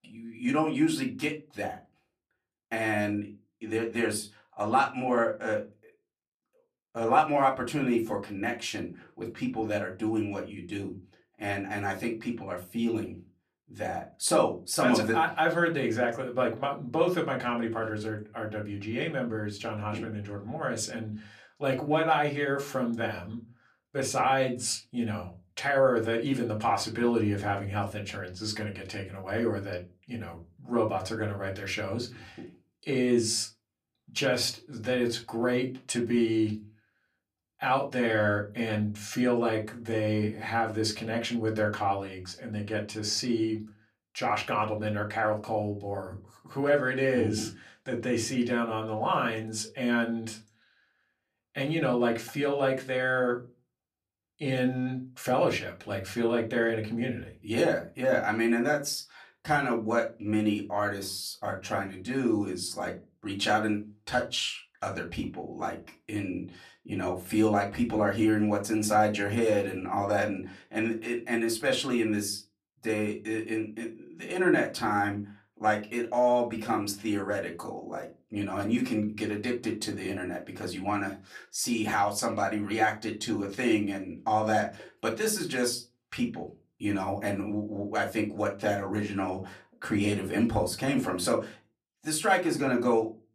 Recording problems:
off-mic speech; far
room echo; very slight; dies away in 0.2 s

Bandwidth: 14.5 kHz